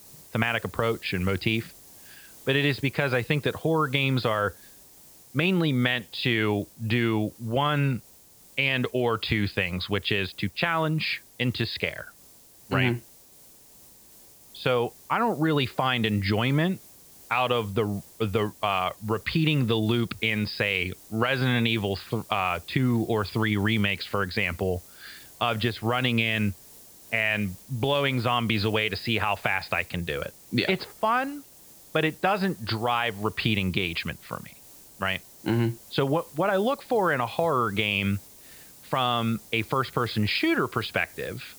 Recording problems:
high frequencies cut off; noticeable; nothing above 5 kHz
hiss; faint; throughout; 20 dB below the speech

